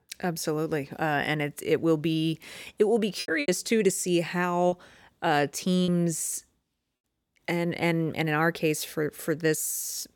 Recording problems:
choppy; very; from 3 to 6 s; 8% of the speech affected

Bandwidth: 17.5 kHz